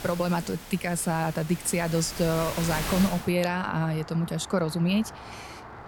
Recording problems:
rain or running water; noticeable; throughout; 10 dB below the speech

